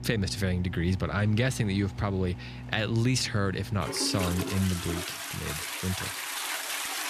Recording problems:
household noises; loud; throughout; 6 dB below the speech

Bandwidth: 14.5 kHz